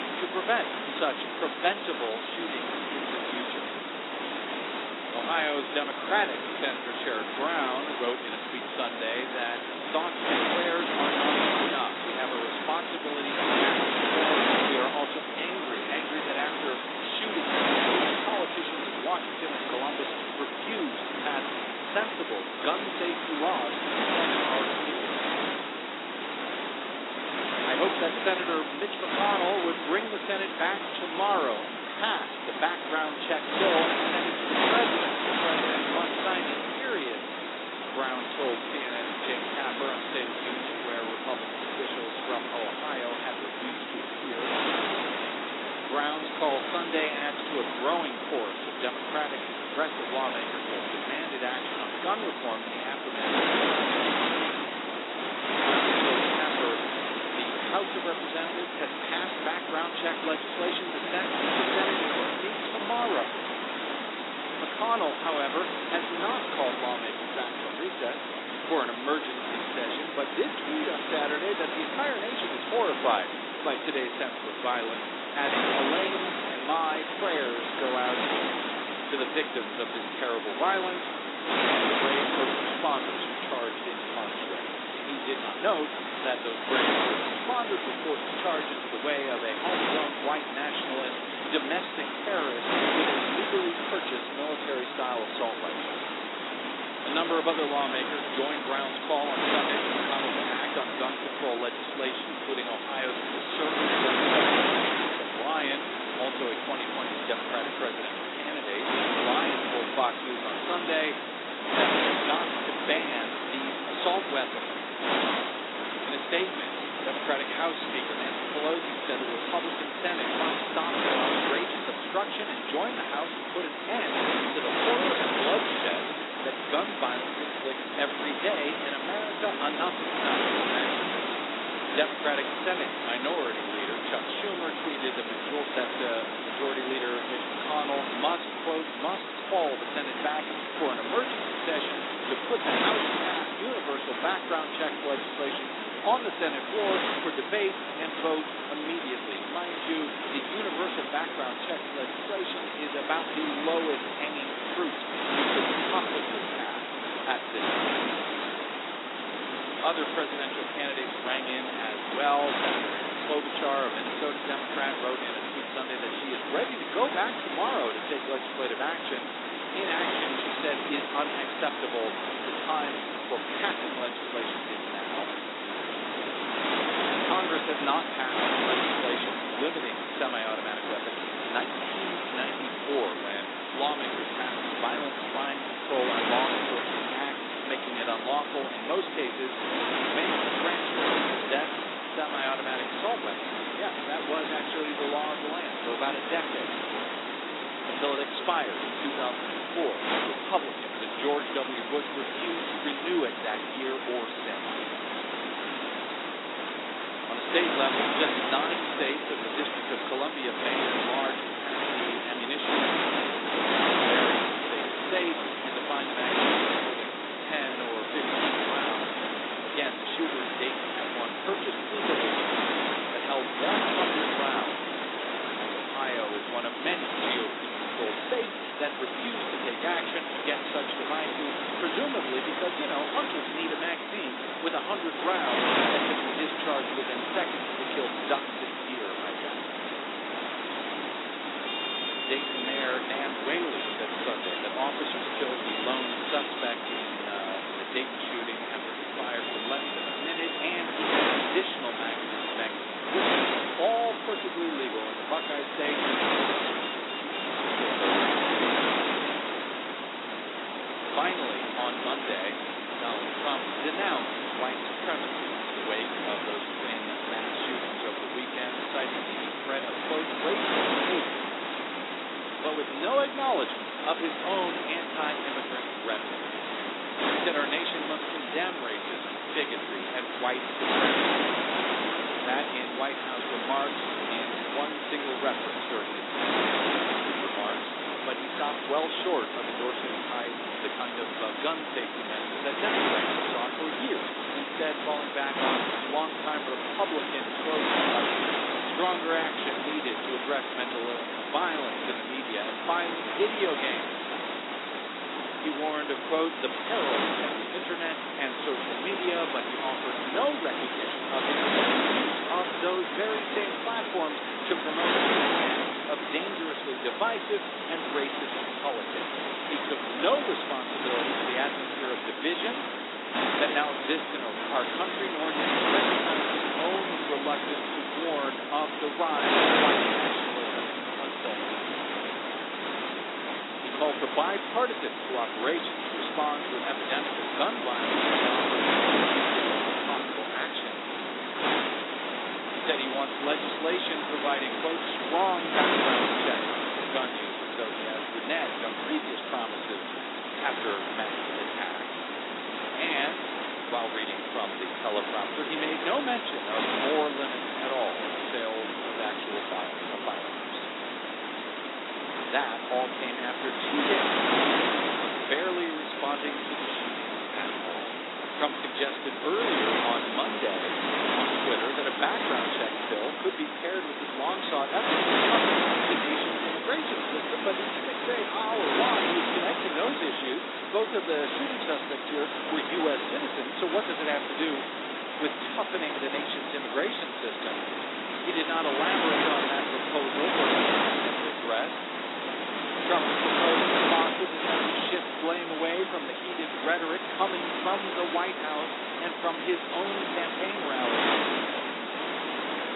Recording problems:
garbled, watery; badly; nothing above 4 kHz
thin; somewhat; fading below 300 Hz
wind noise on the microphone; heavy; 2 dB above the speech
traffic noise; noticeable; throughout; 10 dB below the speech

